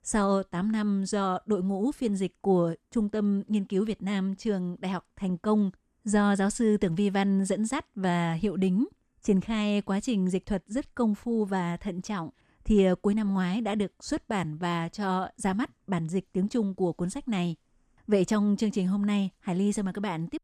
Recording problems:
none

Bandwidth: 14.5 kHz